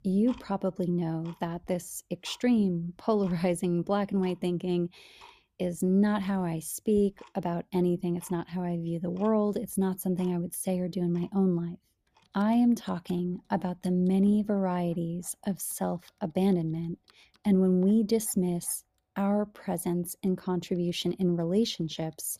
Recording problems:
household noises; faint; throughout; 30 dB below the speech

